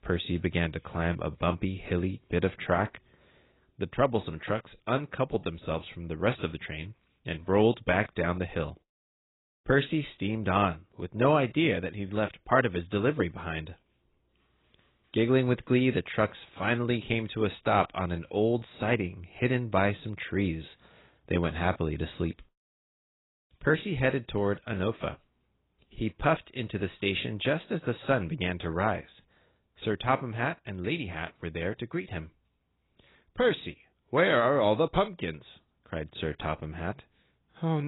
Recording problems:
garbled, watery; badly; nothing above 4 kHz
abrupt cut into speech; at the end

